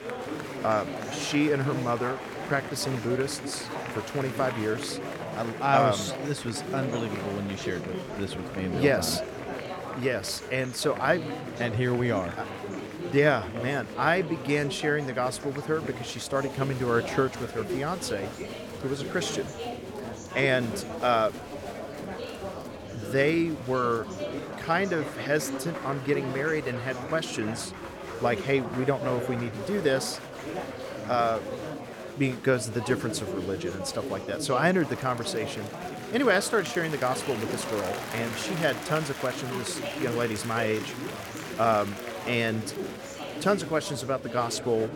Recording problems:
murmuring crowd; loud; throughout; 7 dB below the speech

